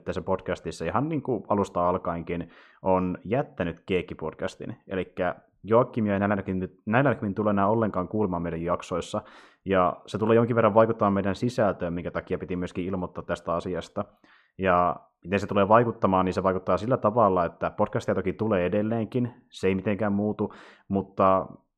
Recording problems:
muffled; slightly; fading above 2 kHz

